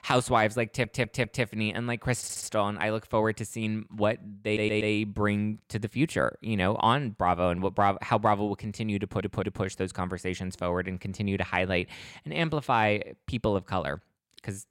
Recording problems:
audio stuttering; 4 times, first at 0.5 s

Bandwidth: 16 kHz